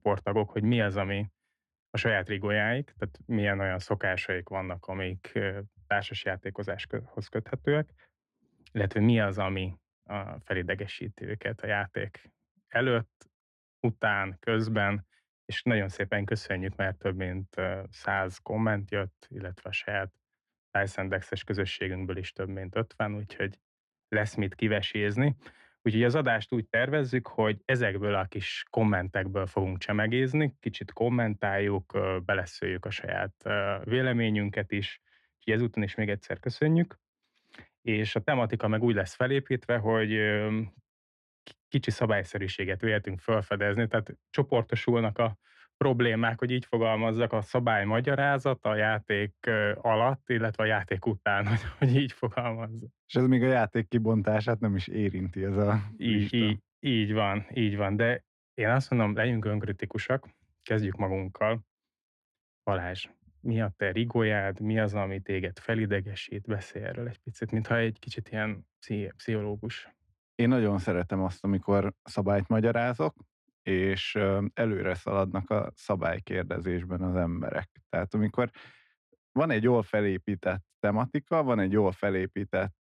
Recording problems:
muffled; very; fading above 4 kHz

